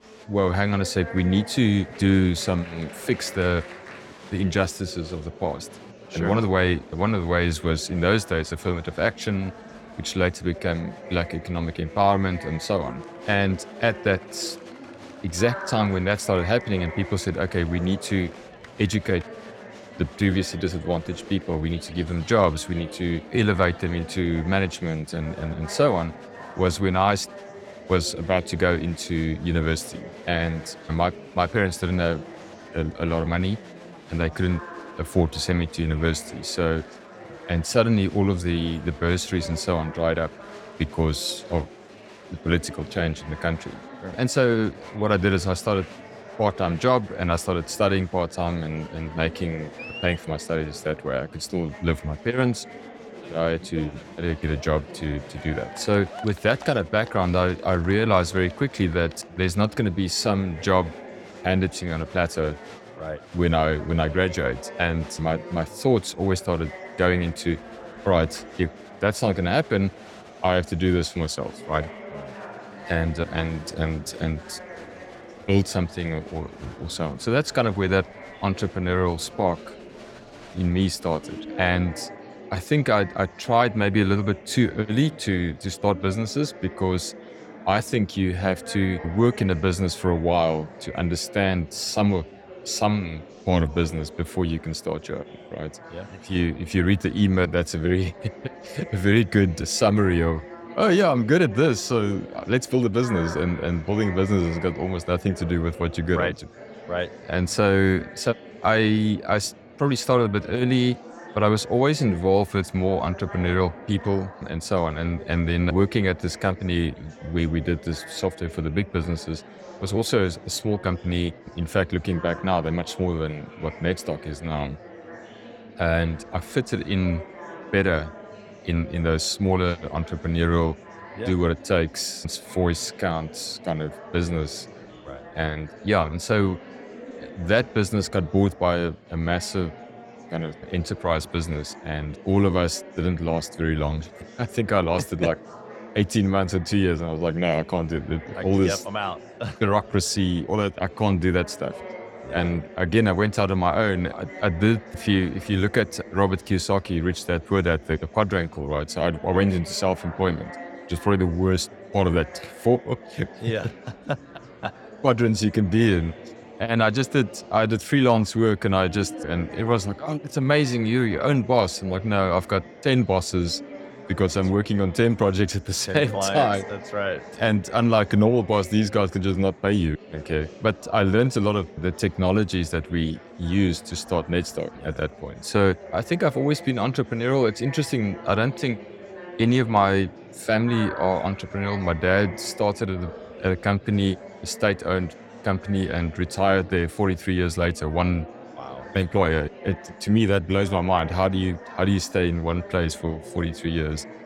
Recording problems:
murmuring crowd; noticeable; throughout; 15 dB below the speech

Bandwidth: 17 kHz